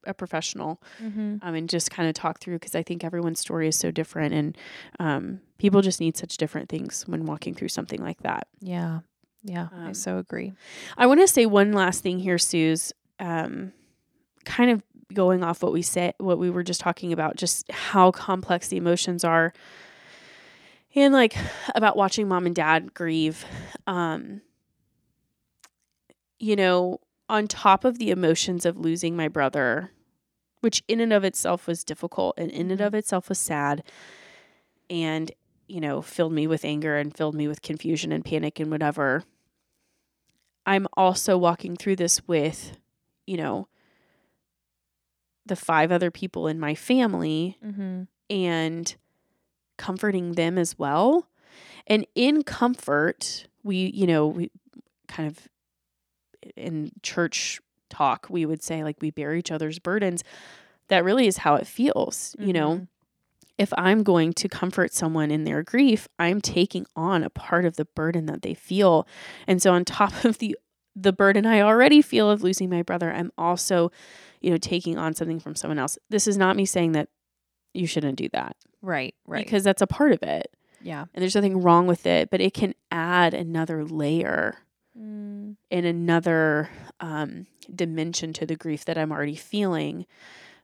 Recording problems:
none

